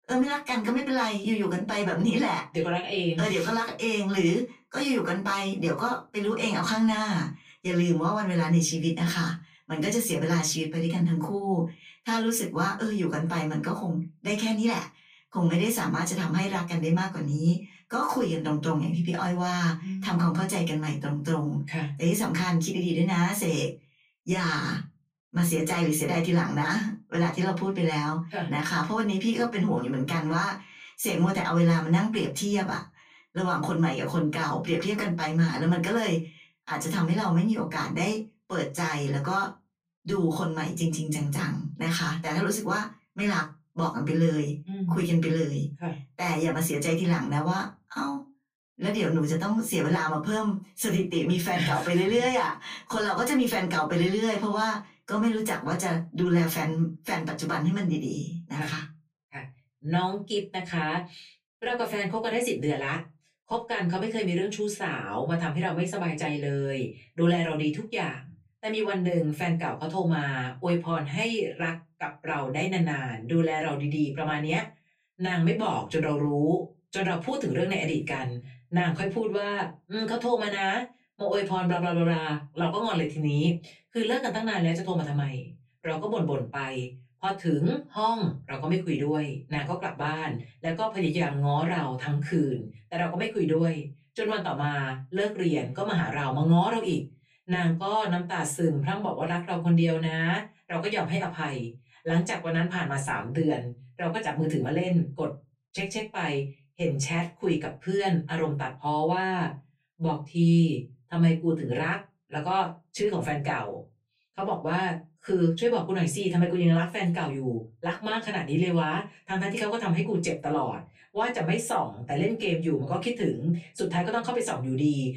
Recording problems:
off-mic speech; far
room echo; very slight; dies away in 0.2 s

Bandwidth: 15 kHz